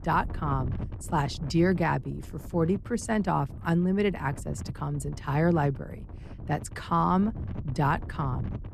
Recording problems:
wind noise on the microphone; occasional gusts; 20 dB below the speech

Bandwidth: 14 kHz